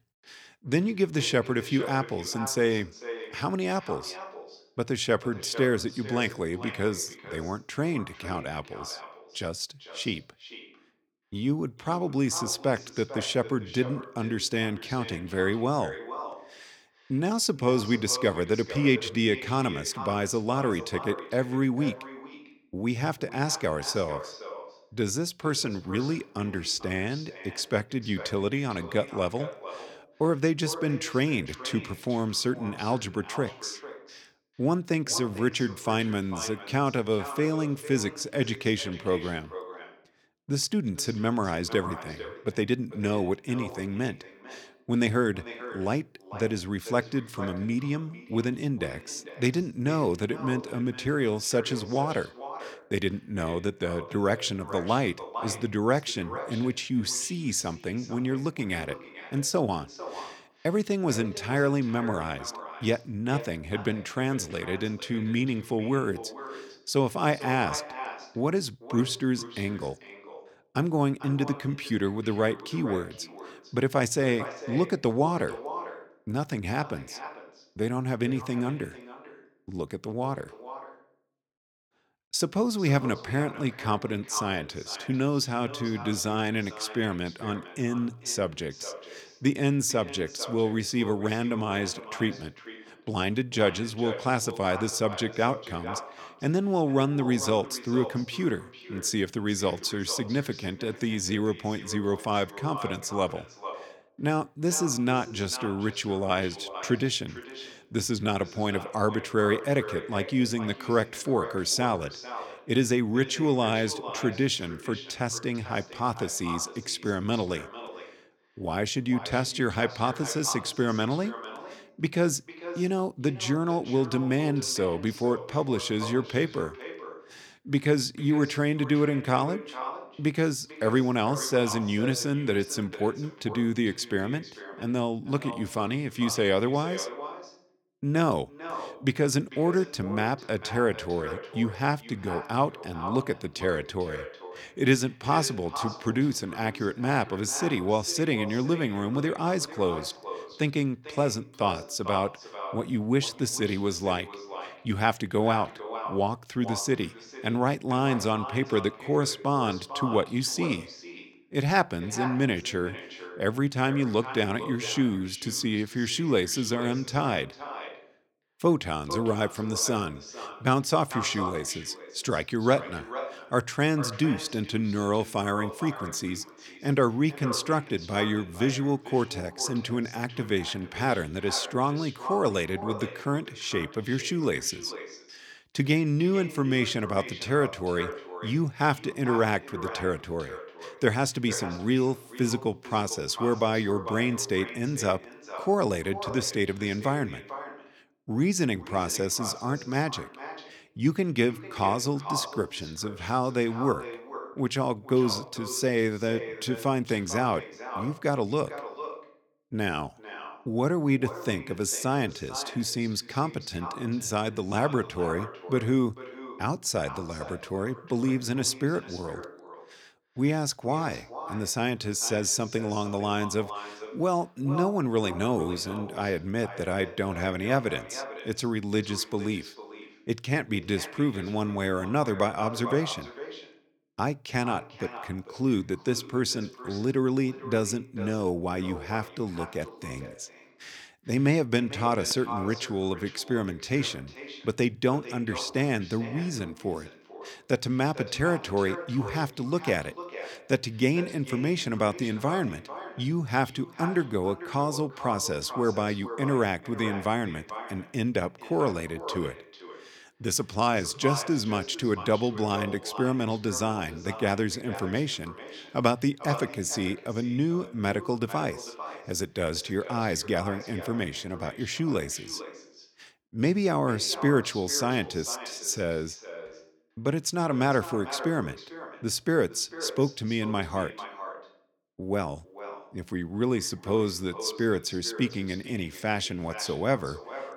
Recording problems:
echo of what is said; noticeable; throughout; 450 ms later, 15 dB below the speech

